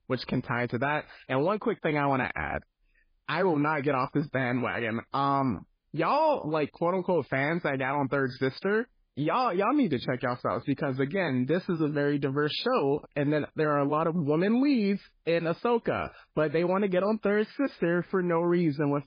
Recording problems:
garbled, watery; badly; nothing above 5 kHz

